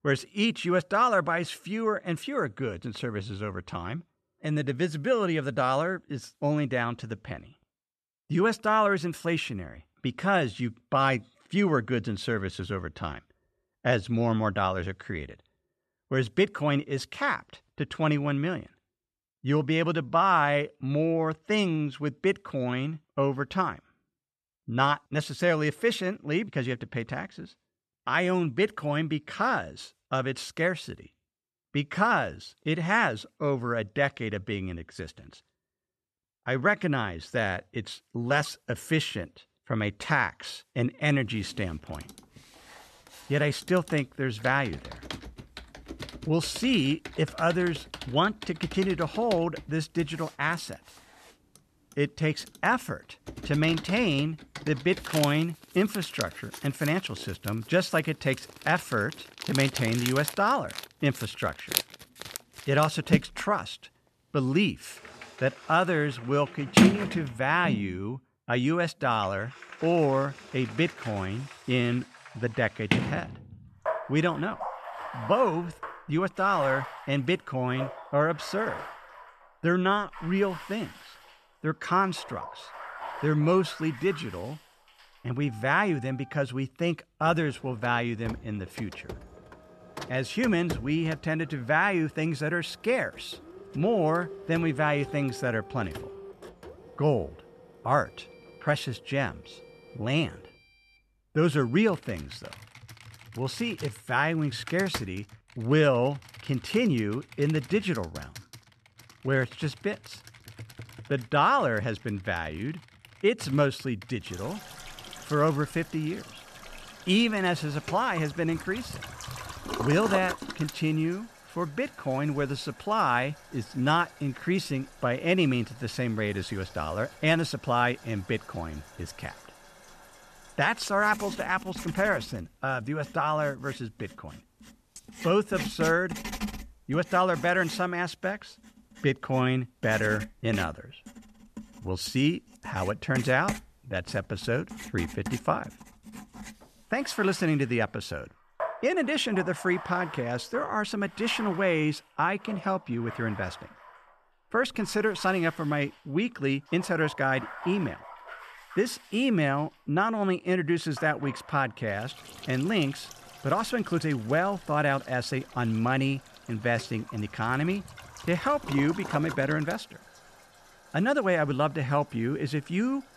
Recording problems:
household noises; noticeable; from 41 s on; 10 dB below the speech

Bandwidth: 13.5 kHz